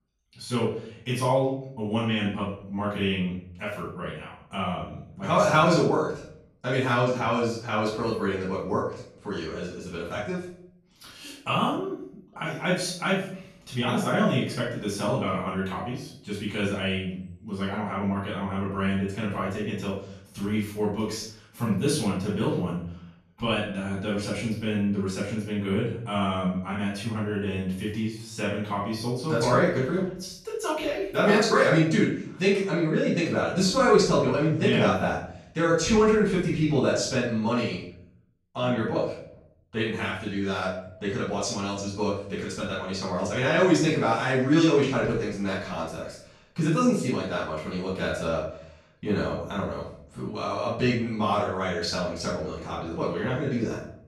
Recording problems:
off-mic speech; far
room echo; noticeable; dies away in 0.5 s

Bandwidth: 14.5 kHz